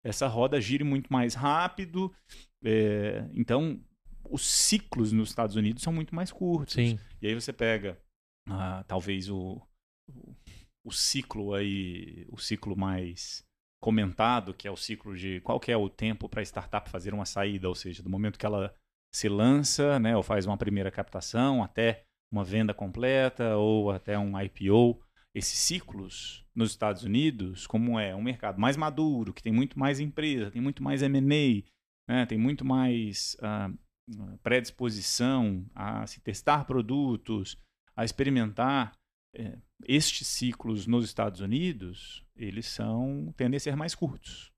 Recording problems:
none

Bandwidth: 14.5 kHz